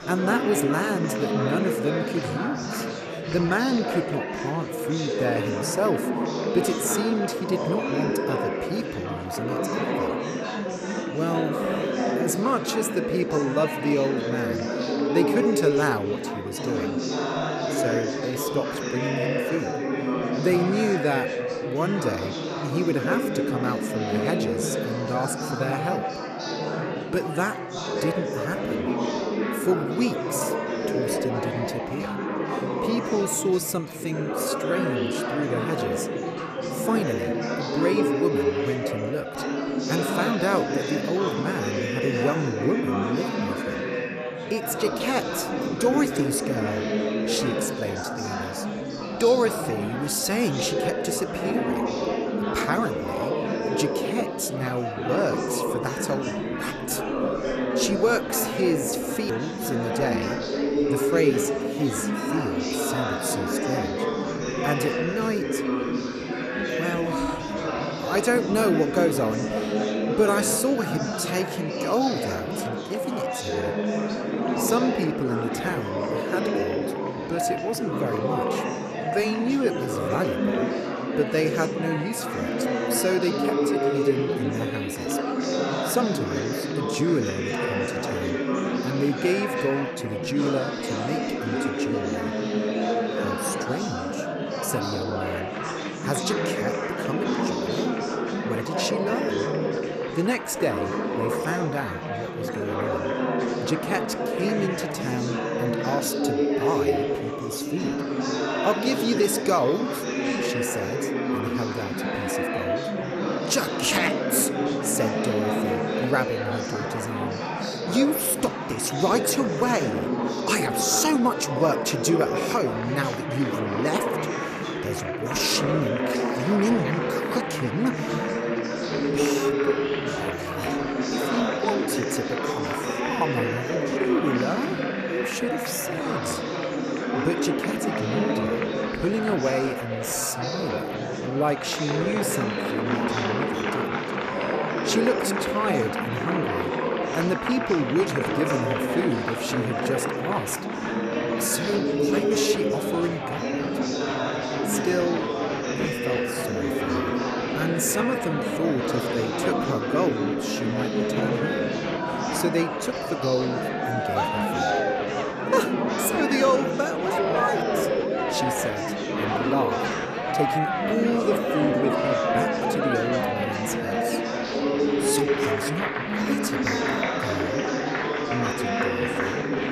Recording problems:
murmuring crowd; very loud; throughout; 1 dB above the speech

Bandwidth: 14.5 kHz